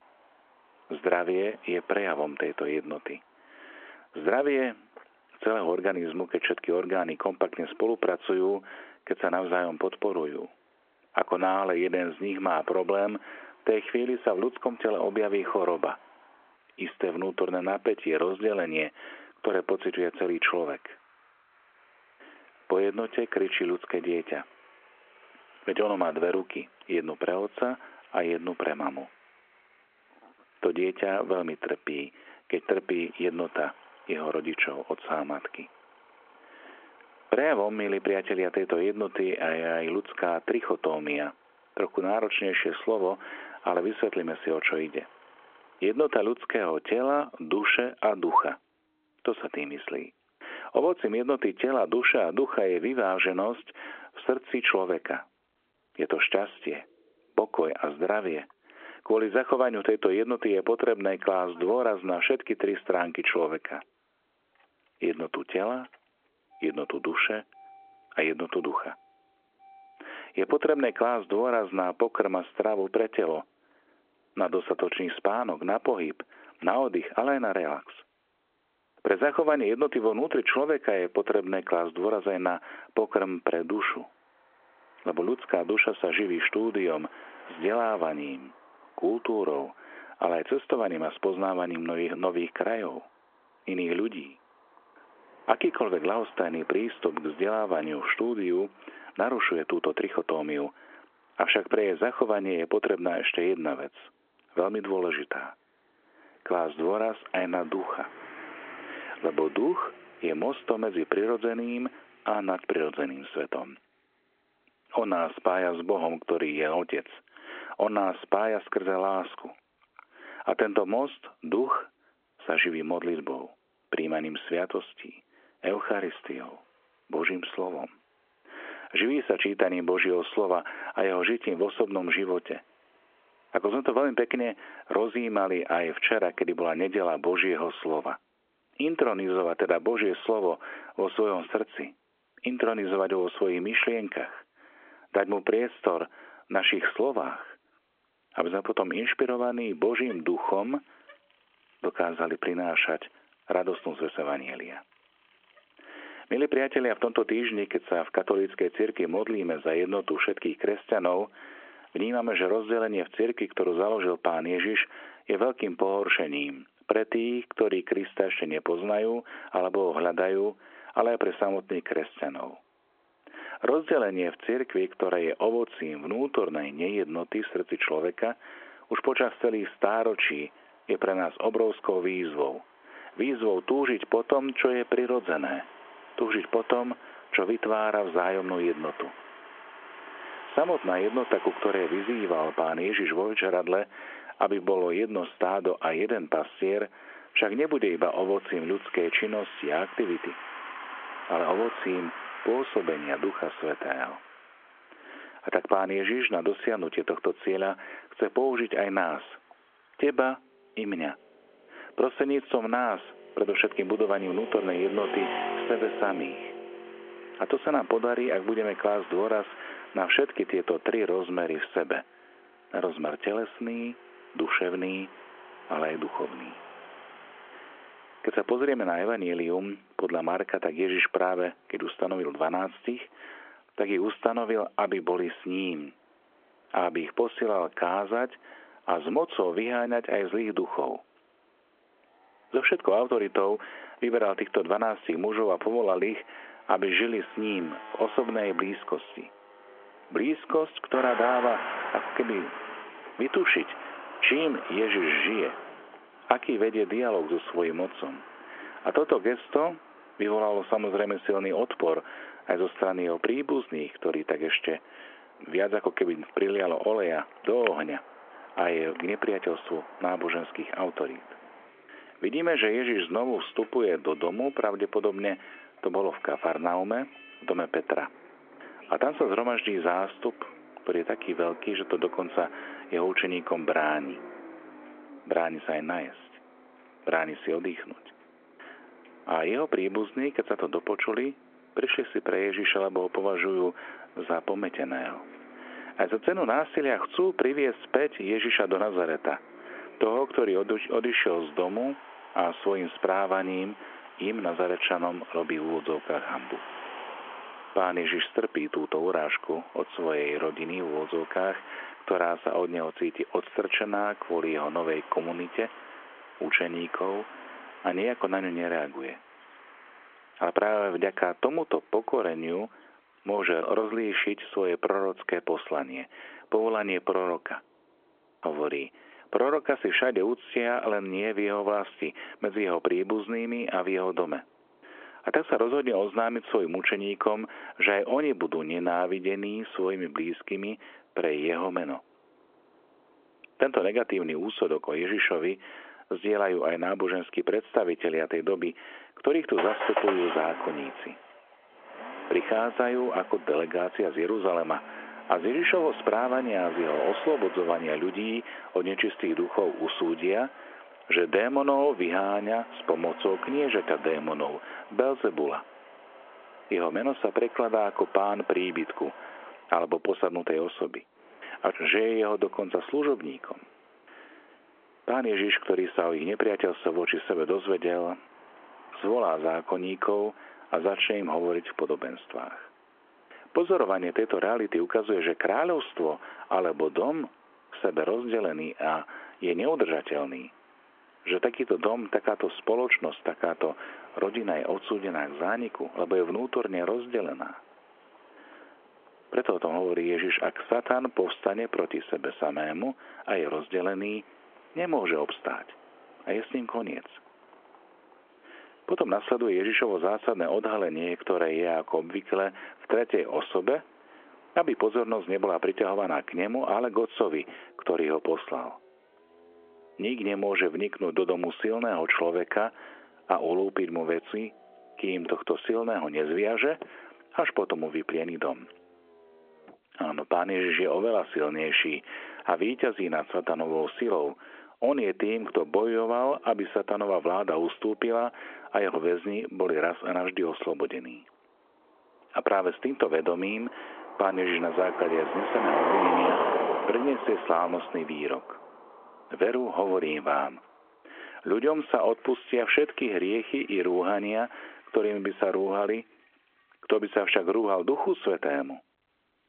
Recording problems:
phone-call audio
traffic noise; noticeable; throughout; 15 dB below the speech

